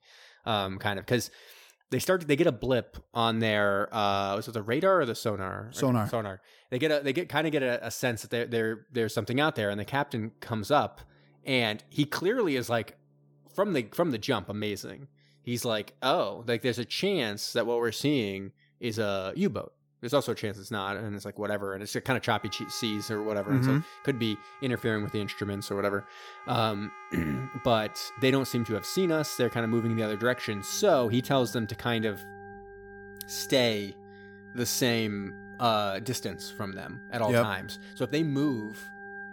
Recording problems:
background music; noticeable; from 9.5 s on; 15 dB below the speech

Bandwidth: 17.5 kHz